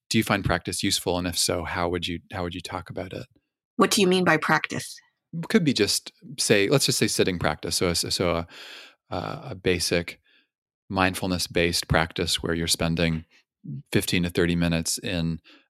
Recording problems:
none

